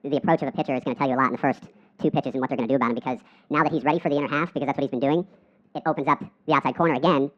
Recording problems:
muffled; very; fading above 1.5 kHz
wrong speed and pitch; too fast and too high; 1.6 times normal speed

